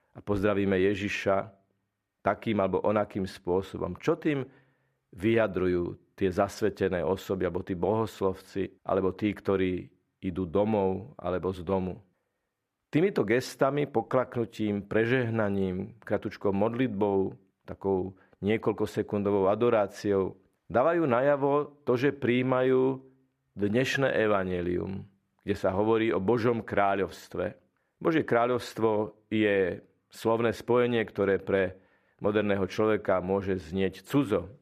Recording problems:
muffled; slightly; fading above 3.5 kHz

